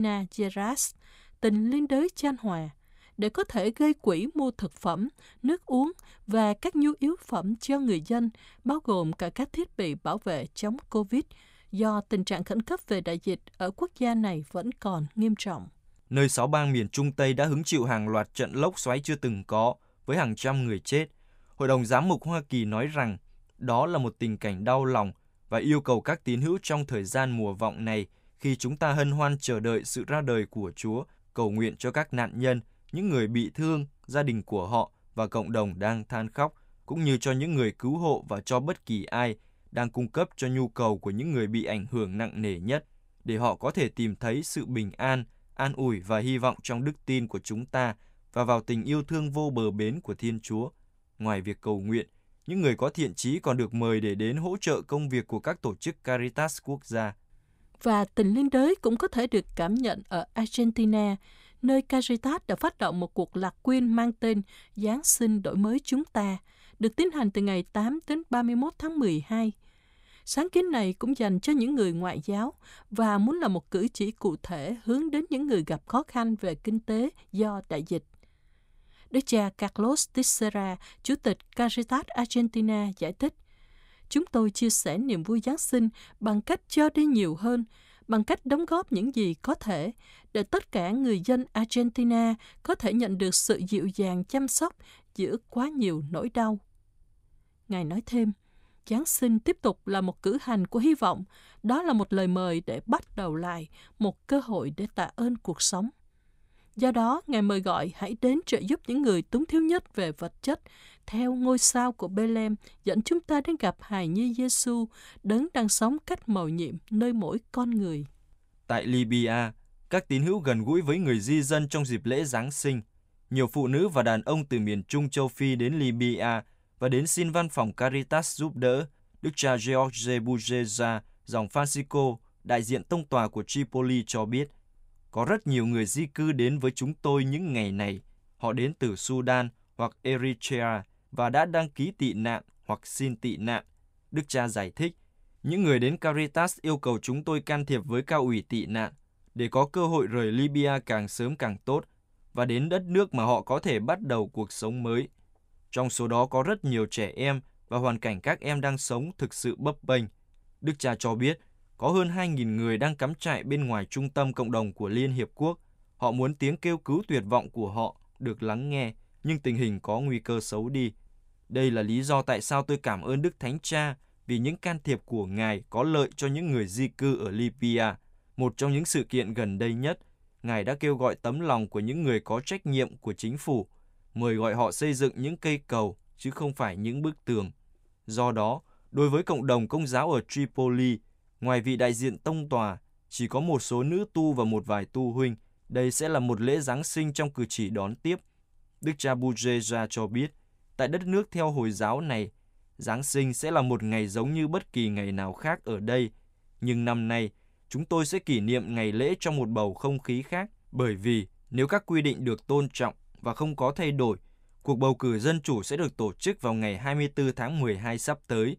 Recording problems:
abrupt cut into speech; at the start

